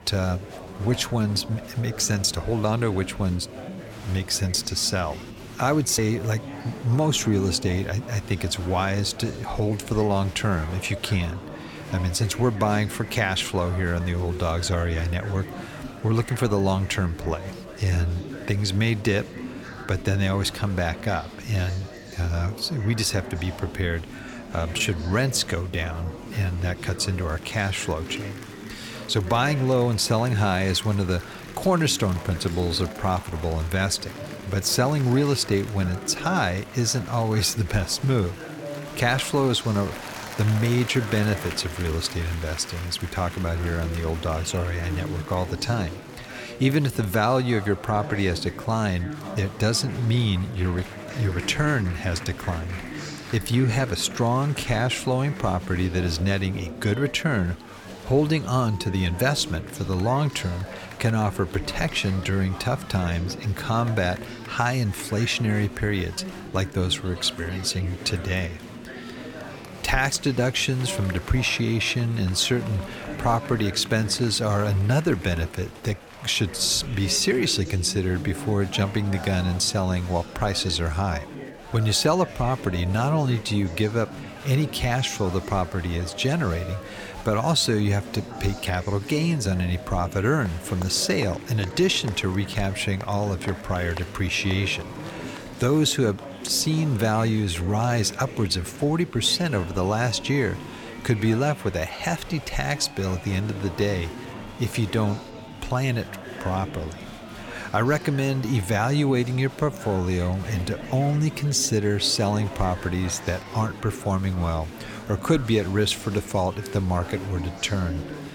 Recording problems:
chatter from many people; noticeable; throughout; 10 dB below the speech

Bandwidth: 17 kHz